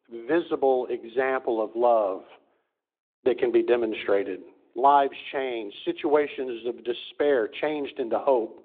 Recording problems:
phone-call audio; nothing above 3.5 kHz

